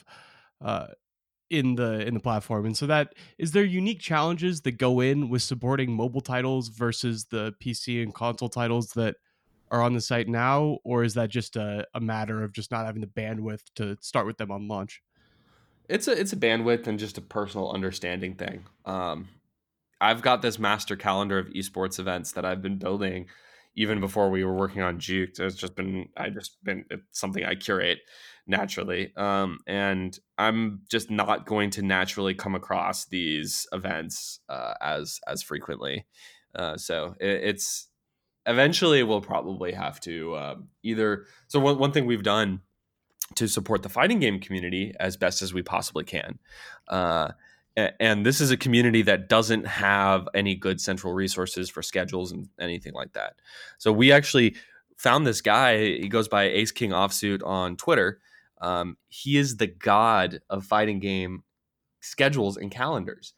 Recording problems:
none

